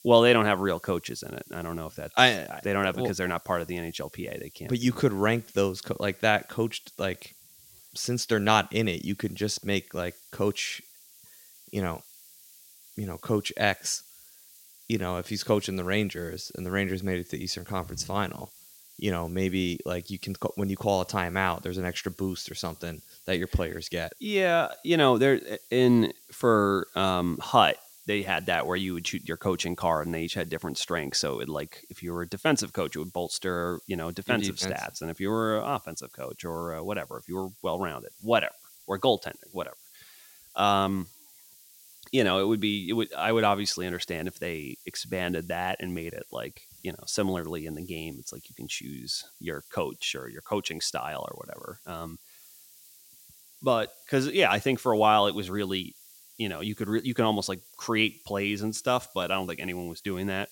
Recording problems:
hiss; faint; throughout; 20 dB below the speech

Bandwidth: 16.5 kHz